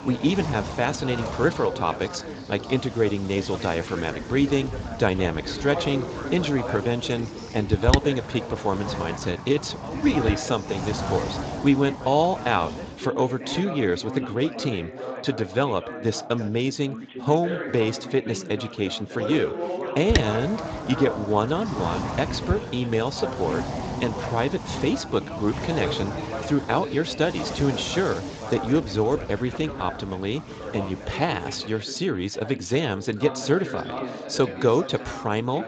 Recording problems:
garbled, watery; slightly; nothing above 7.5 kHz
wind noise on the microphone; heavy; until 13 s and from 20 to 32 s; 9 dB below the speech
background chatter; loud; throughout; 4 voices, 9 dB below the speech

